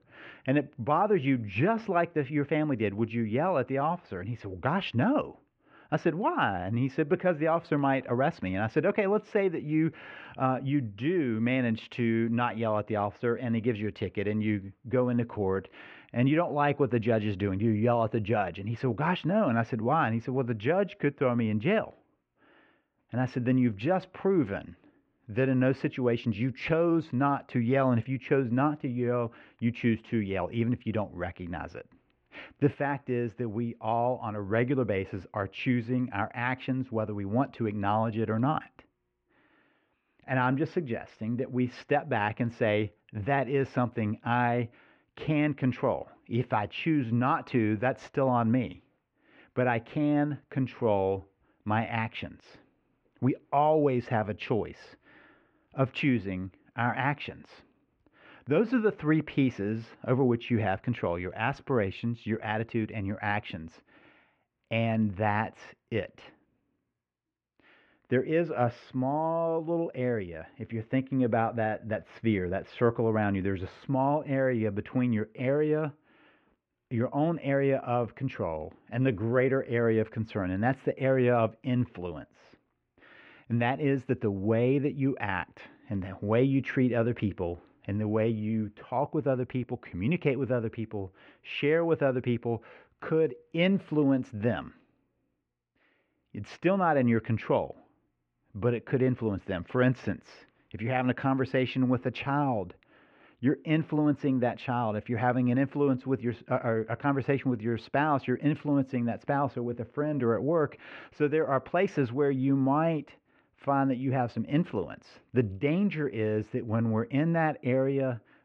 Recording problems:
muffled; very; fading above 2.5 kHz

